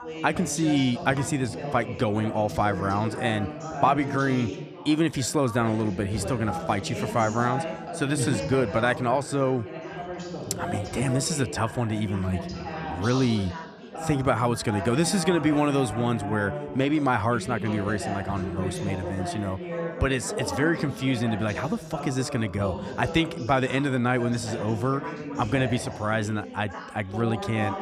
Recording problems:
background chatter; loud; throughout; 3 voices, 8 dB below the speech

